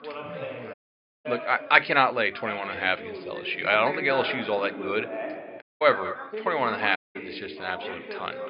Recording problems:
echo of what is said; noticeable; from 5.5 s on; 200 ms later, 15 dB below the speech
high frequencies cut off; noticeable; nothing above 5 kHz
thin; very slightly; fading below 850 Hz
background chatter; noticeable; throughout; 2 voices, 10 dB below the speech
audio cutting out; at 0.5 s for 0.5 s, at 5.5 s and at 7 s

